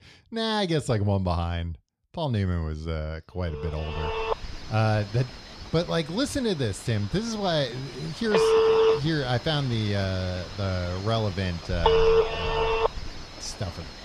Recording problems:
alarms or sirens; very loud; from 4 s on; 4 dB above the speech

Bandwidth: 13.5 kHz